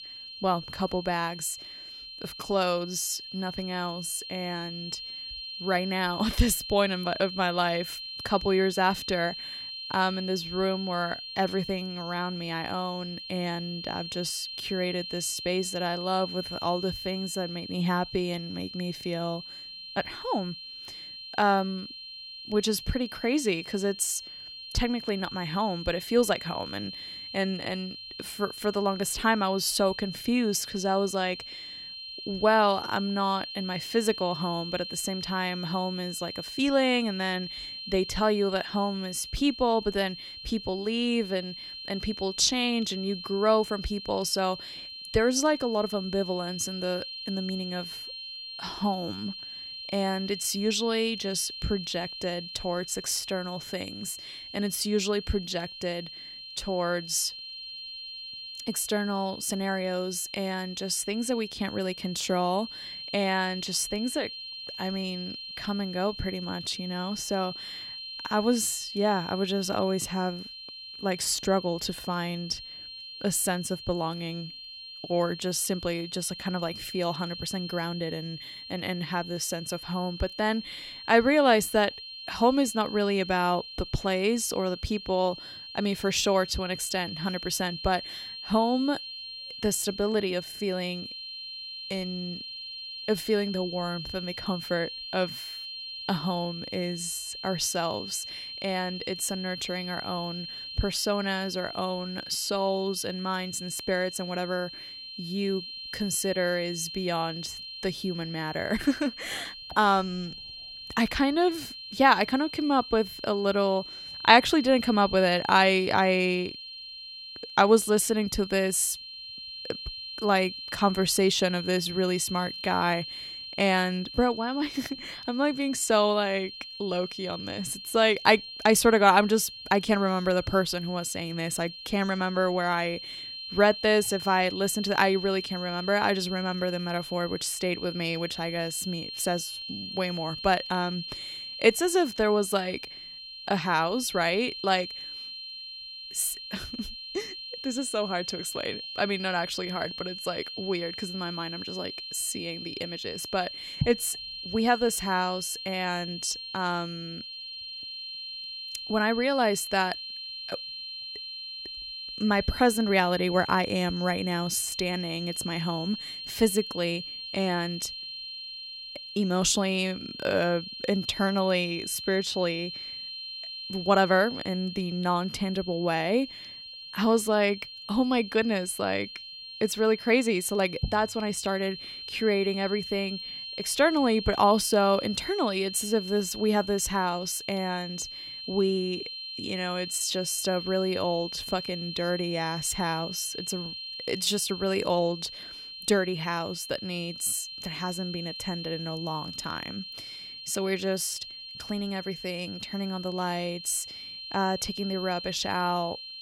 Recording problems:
high-pitched whine; loud; throughout; 4 kHz, 9 dB below the speech

